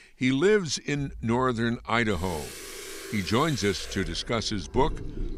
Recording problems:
household noises; noticeable; throughout; 15 dB below the speech

